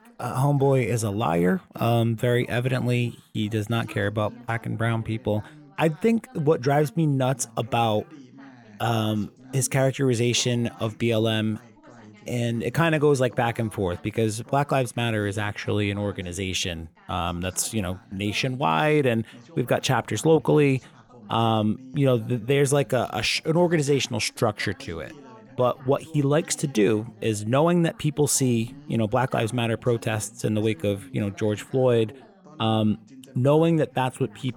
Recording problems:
background chatter; faint; throughout; 2 voices, 25 dB below the speech

